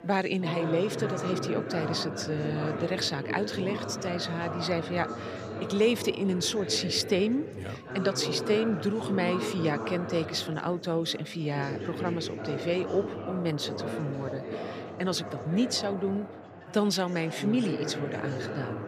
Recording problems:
chatter from many people; loud; throughout; 6 dB below the speech

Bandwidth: 15 kHz